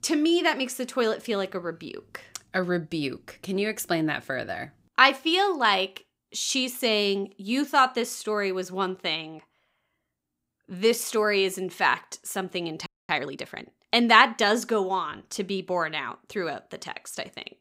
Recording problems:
audio freezing; at 13 s

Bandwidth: 15.5 kHz